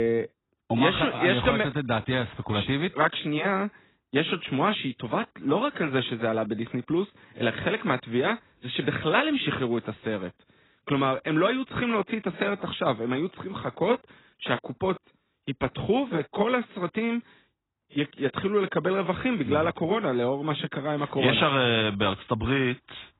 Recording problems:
garbled, watery; badly; nothing above 4 kHz
abrupt cut into speech; at the start

